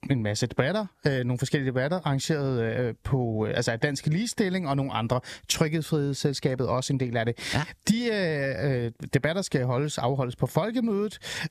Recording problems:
squashed, flat; somewhat

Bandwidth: 14.5 kHz